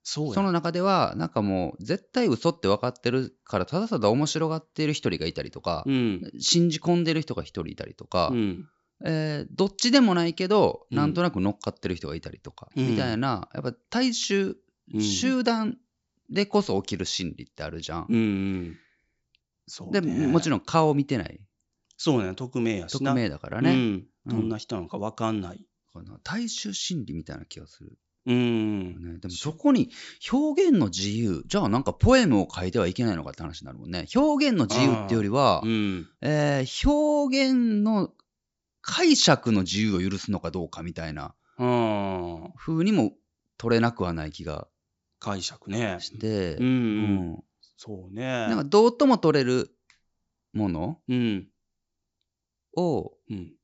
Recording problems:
high frequencies cut off; noticeable; nothing above 8 kHz

